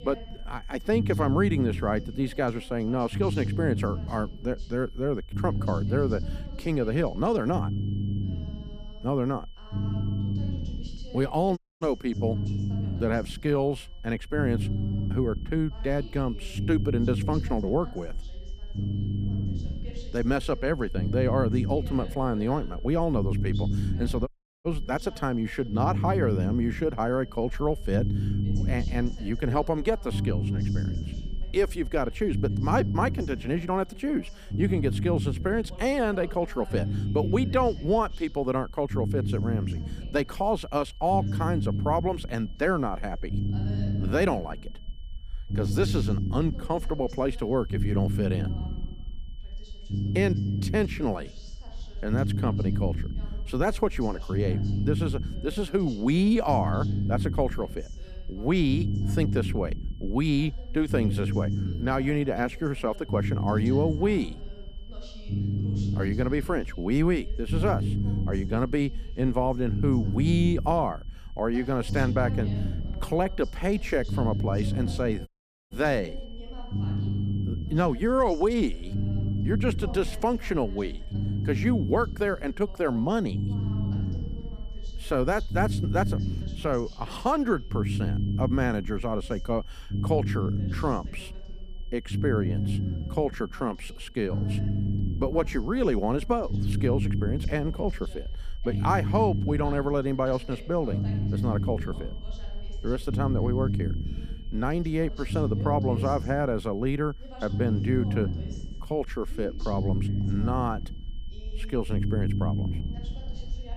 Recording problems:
low rumble; noticeable; throughout; 10 dB below the speech
high-pitched whine; faint; throughout; 3 kHz, 25 dB below the speech
voice in the background; faint; throughout; 20 dB below the speech
audio cutting out; at 12 s, at 24 s and at 1:15

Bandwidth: 15 kHz